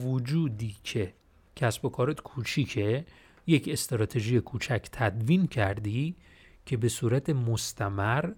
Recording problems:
abrupt cut into speech; at the start

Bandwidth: 17 kHz